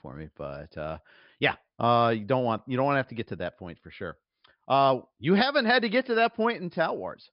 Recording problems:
high frequencies cut off; noticeable; nothing above 5.5 kHz

